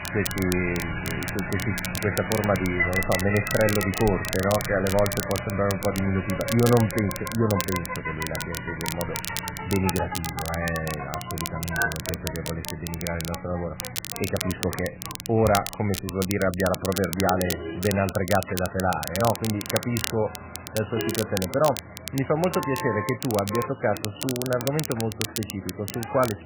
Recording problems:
garbled, watery; badly; nothing above 3 kHz
traffic noise; loud; throughout; 7 dB below the speech
crackle, like an old record; loud; 7 dB below the speech

